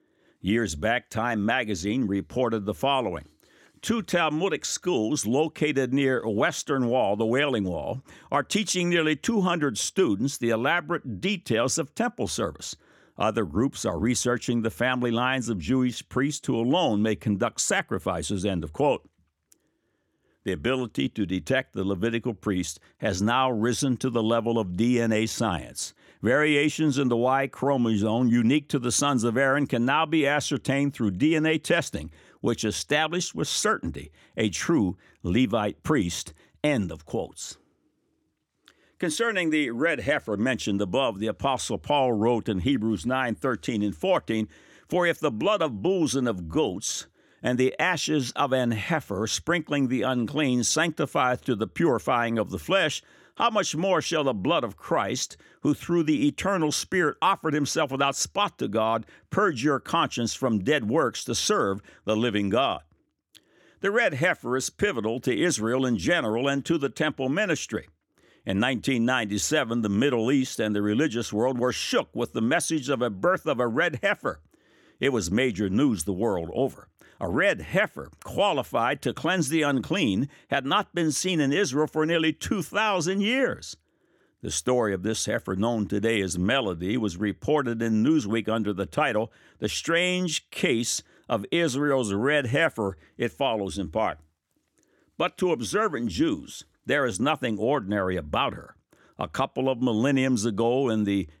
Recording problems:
none

